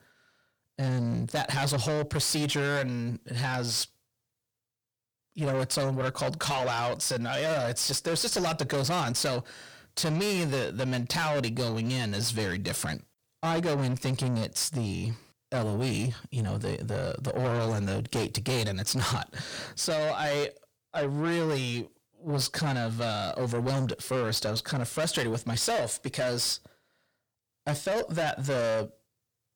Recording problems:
distortion; heavy; 7 dB below the speech

